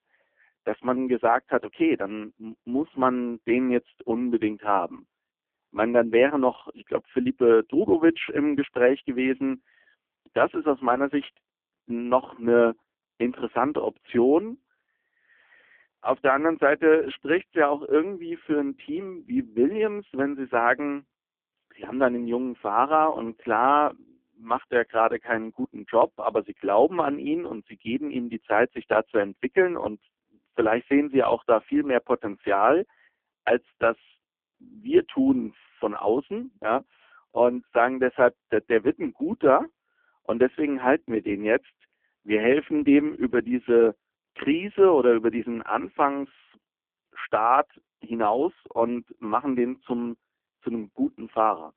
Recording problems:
phone-call audio; poor line

